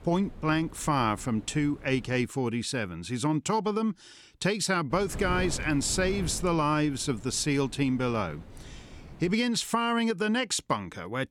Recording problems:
wind noise on the microphone; occasional gusts; until 2 s and from 5 to 9.5 s; 20 dB below the speech

